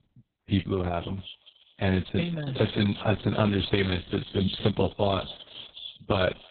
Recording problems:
garbled, watery; badly; nothing above 4 kHz
echo of what is said; noticeable; throughout; 250 ms later, 15 dB below the speech

